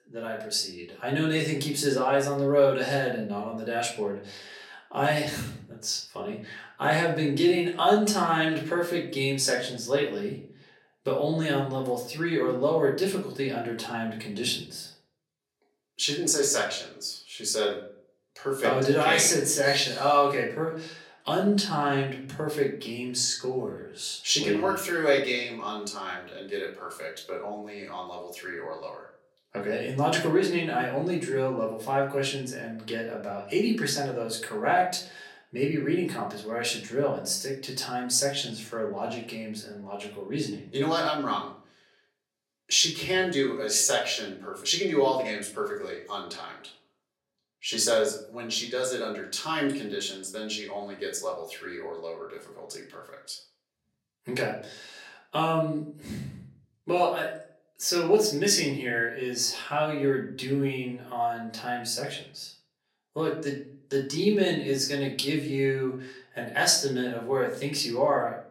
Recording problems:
off-mic speech; far
thin; somewhat; fading below 300 Hz
room echo; slight; dies away in 0.5 s

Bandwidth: 16 kHz